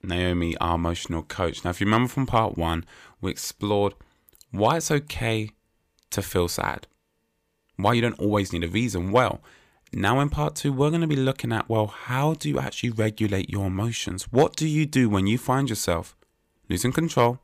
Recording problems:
none

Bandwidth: 15 kHz